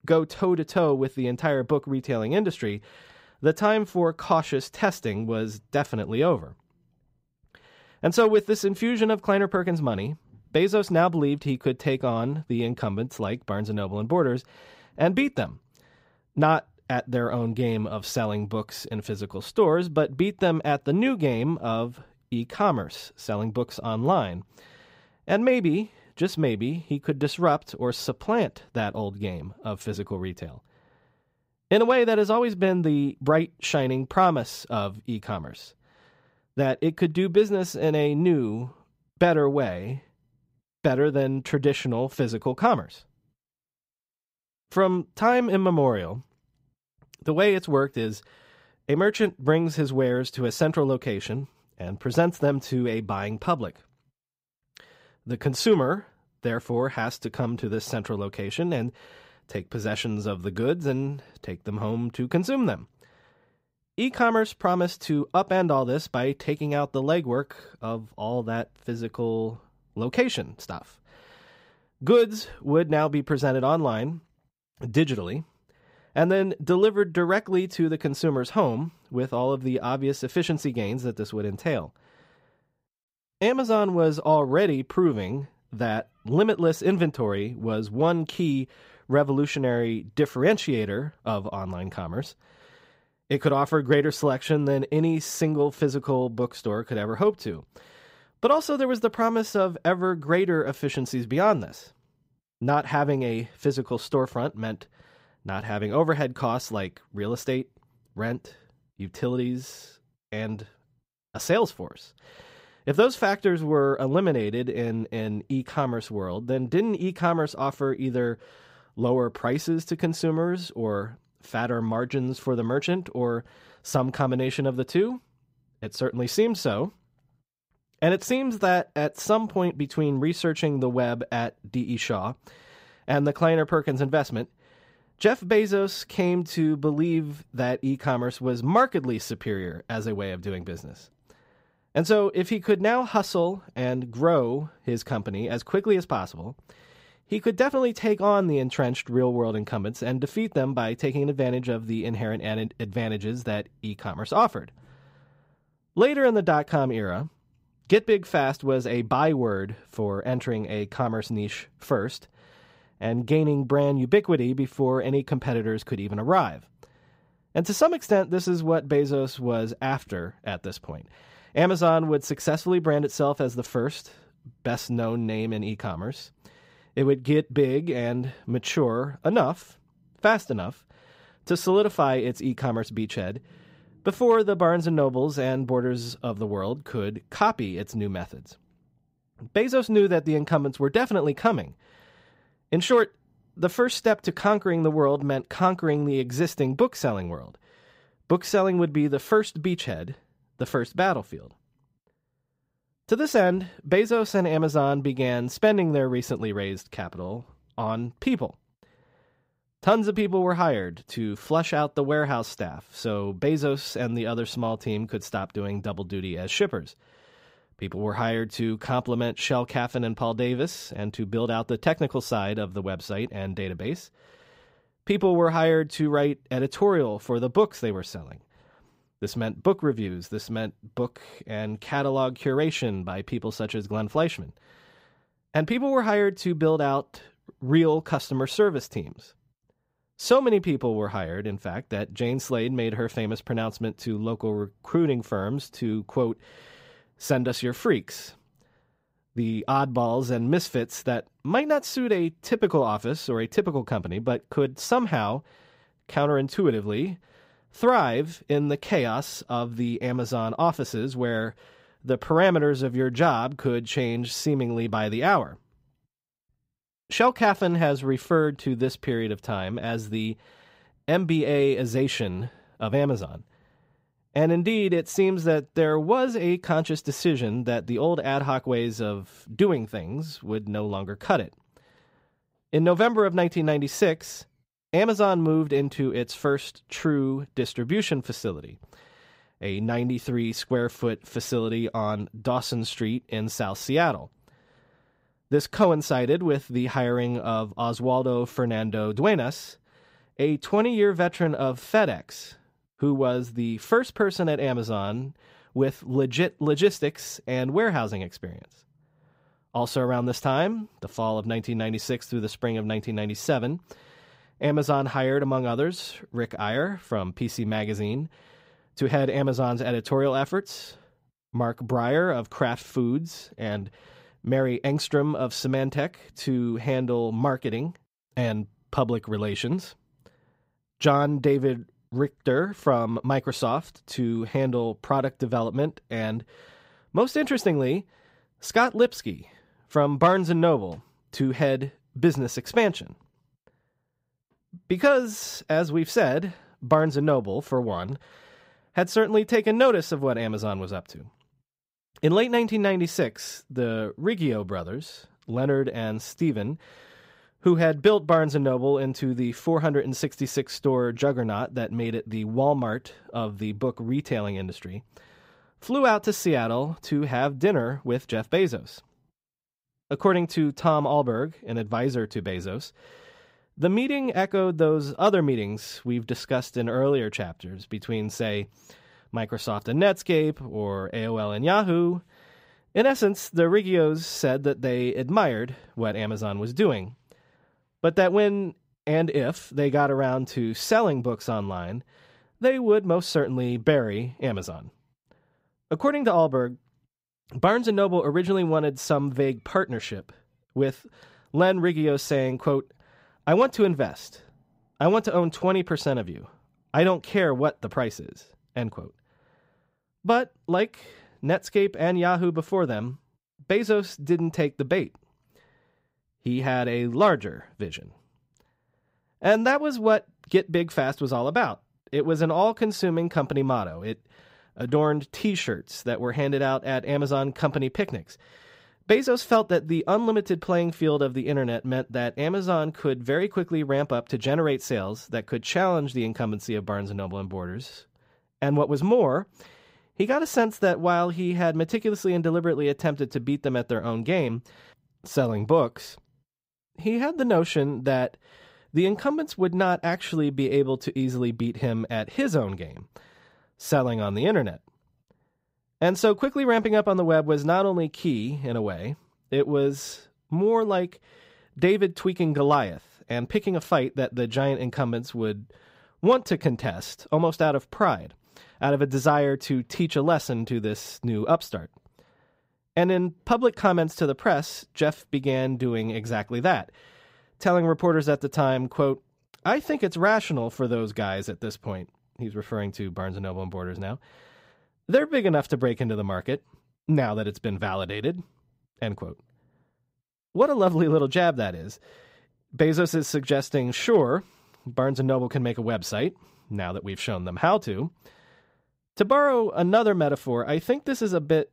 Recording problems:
none

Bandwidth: 15.5 kHz